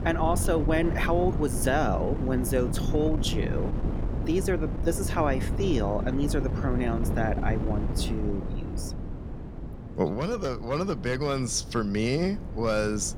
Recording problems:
wind noise on the microphone; occasional gusts; 10 dB below the speech

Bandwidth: 17 kHz